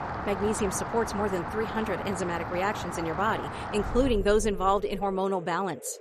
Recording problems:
rain or running water; loud; throughout; 7 dB below the speech

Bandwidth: 13.5 kHz